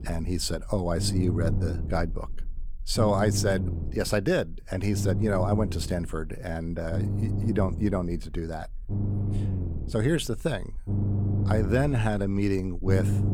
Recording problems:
low rumble; noticeable; throughout; 10 dB below the speech

